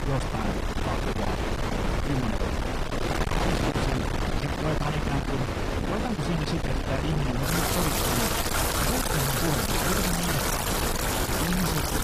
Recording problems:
distortion; heavy; 32% of the sound clipped
garbled, watery; slightly; nothing above 14.5 kHz
rain or running water; very loud; throughout; 2 dB above the speech
wind noise on the microphone; heavy; 4 dB above the speech

